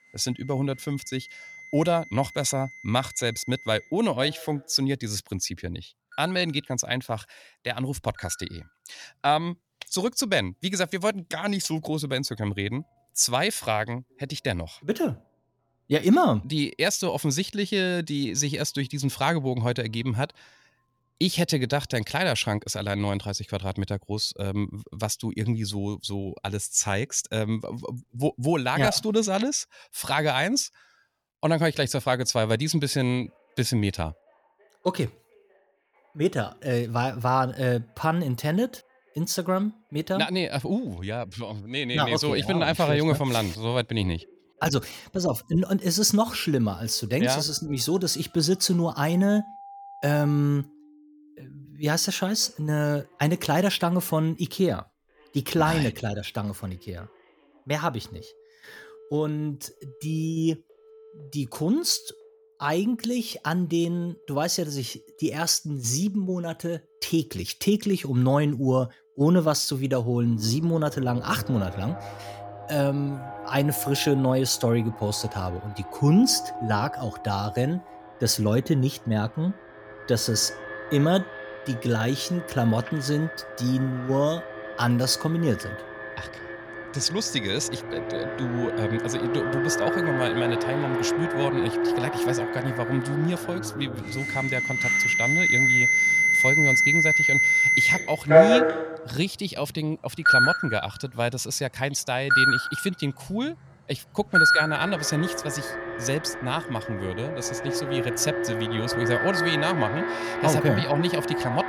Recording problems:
alarms or sirens; very loud; throughout; 2 dB above the speech

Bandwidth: 18.5 kHz